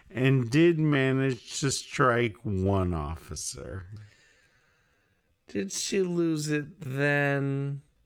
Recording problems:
wrong speed, natural pitch; too slow; 0.5 times normal speed

